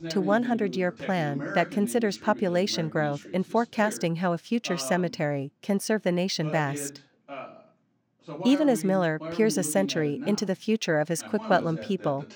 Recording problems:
voice in the background; noticeable; throughout; 10 dB below the speech

